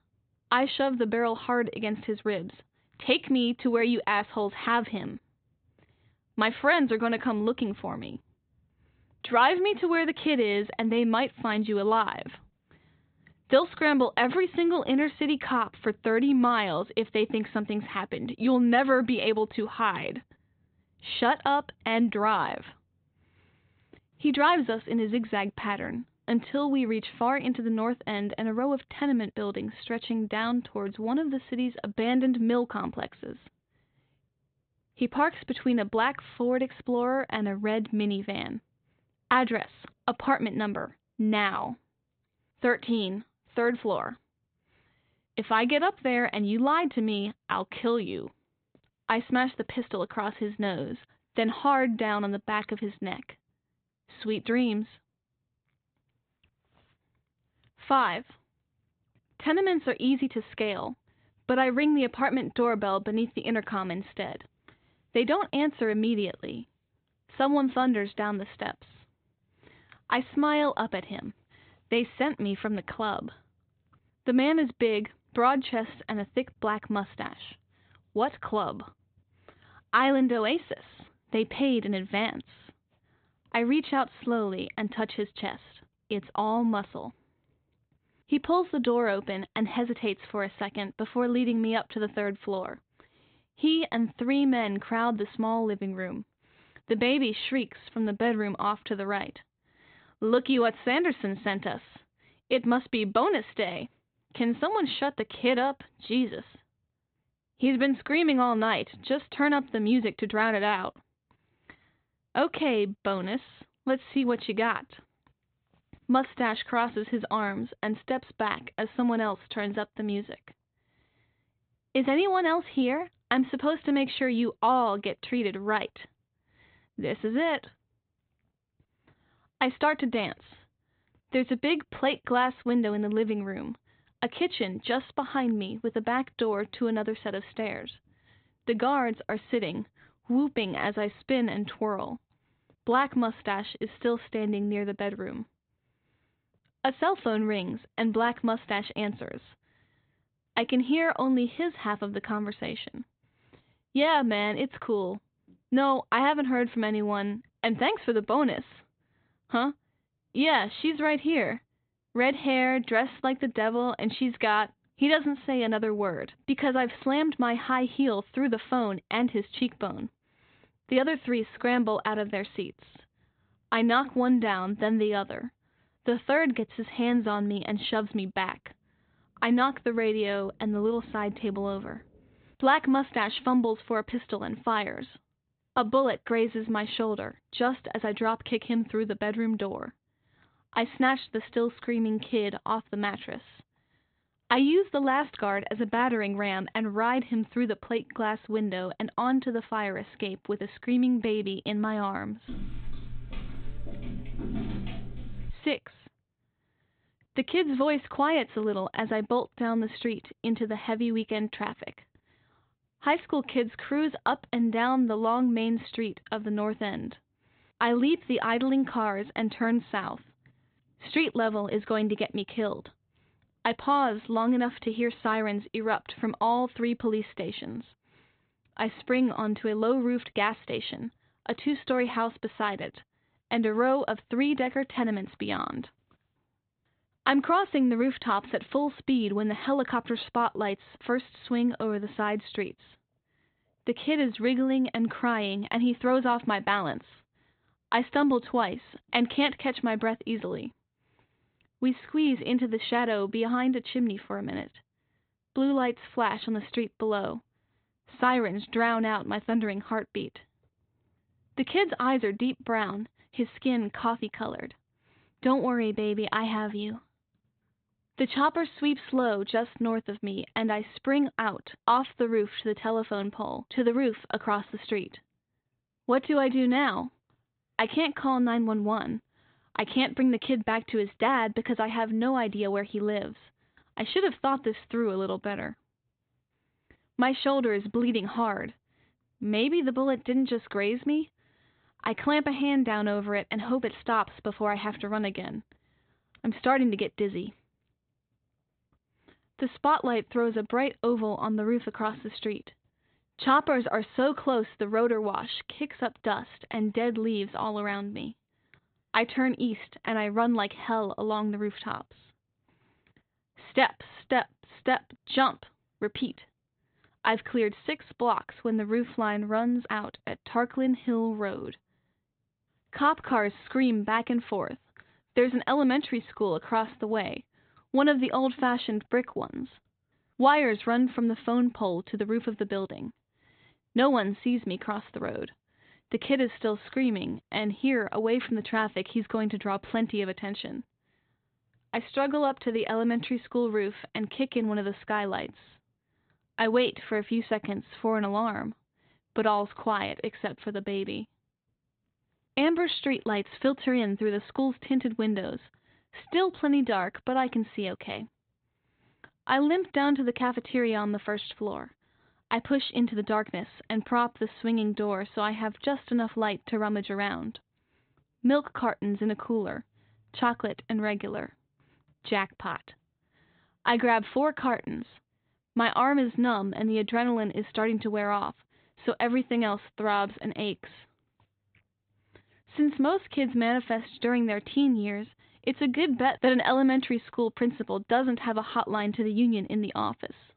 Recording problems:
high frequencies cut off; severe; nothing above 4 kHz
footsteps; noticeable; from 3:22 to 3:26; peak 6 dB below the speech

